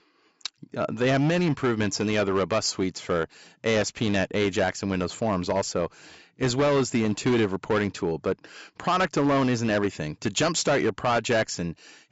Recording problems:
high frequencies cut off; noticeable; nothing above 8 kHz
distortion; slight; 9% of the sound clipped

